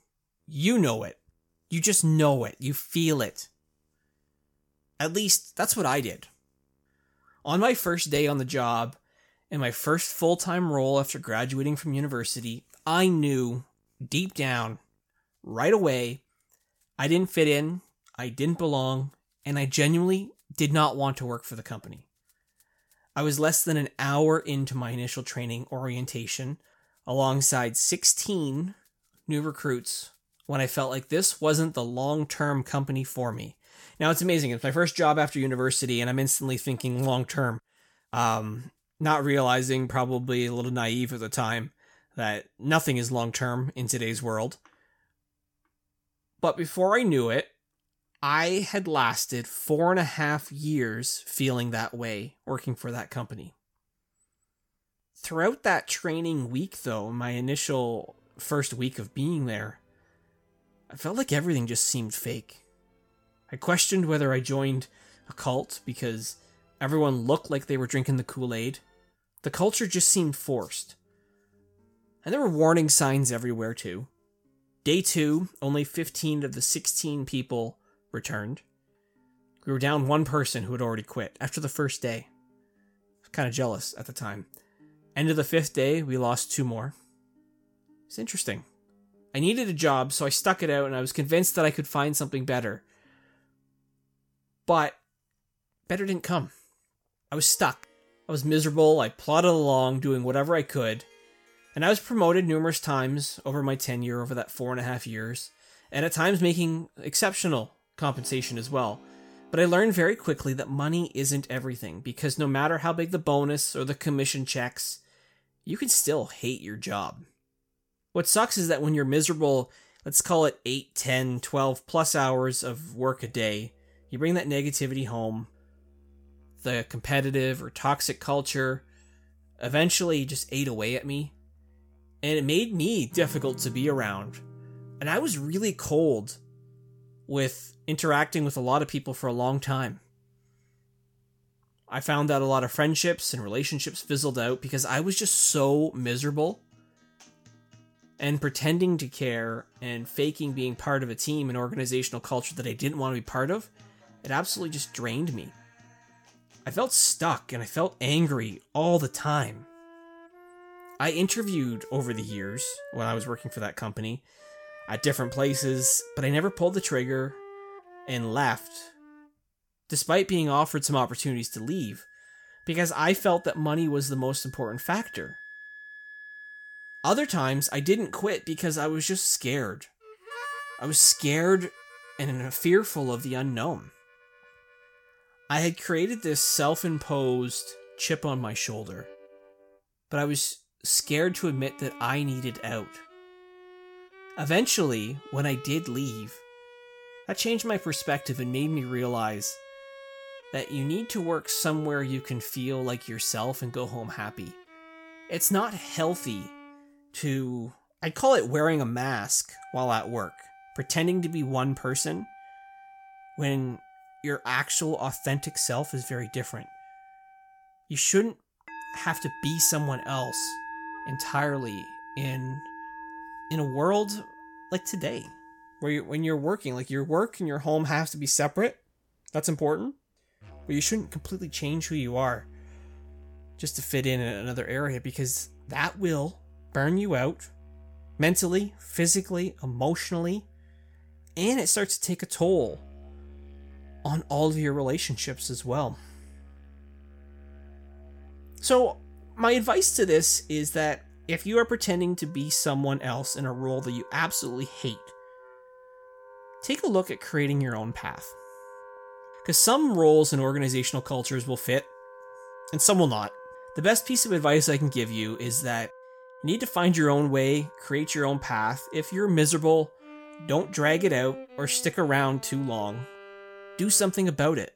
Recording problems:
background music; faint; throughout; 20 dB below the speech

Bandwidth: 17 kHz